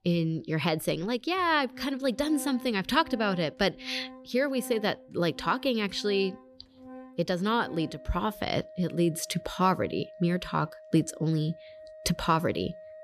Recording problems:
background music; noticeable; throughout; 20 dB below the speech

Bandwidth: 14 kHz